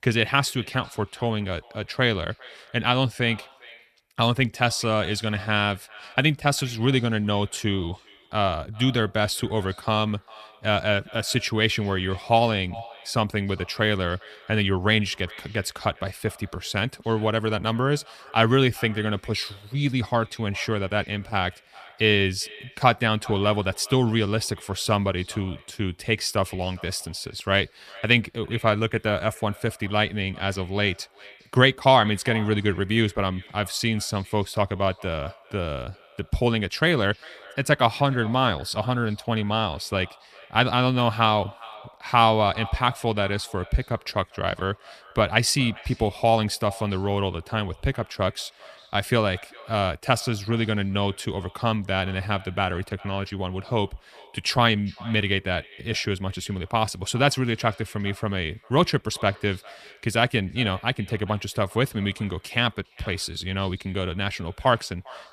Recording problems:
echo of what is said; faint; throughout; 400 ms later, 20 dB below the speech

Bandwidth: 14.5 kHz